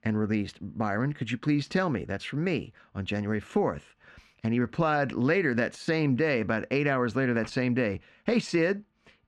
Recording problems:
muffled; slightly; fading above 2.5 kHz

